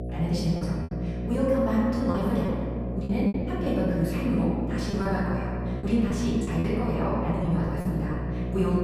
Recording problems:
room echo; strong; dies away in 2.1 s
off-mic speech; far
wrong speed, natural pitch; too fast; 1.5 times normal speed
electrical hum; loud; throughout; 60 Hz, 9 dB below the speech
choppy; very; 7% of the speech affected

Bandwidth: 14.5 kHz